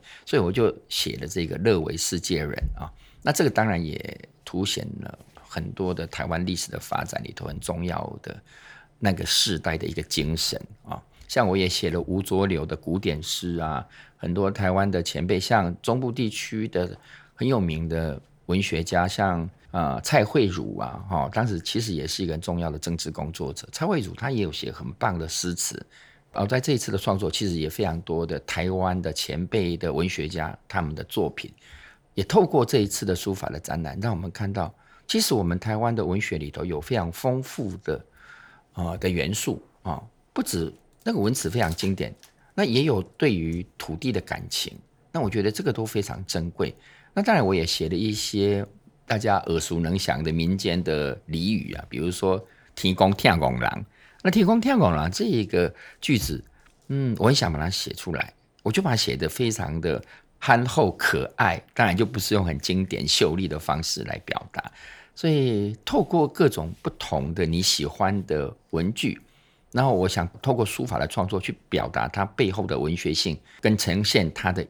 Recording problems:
none

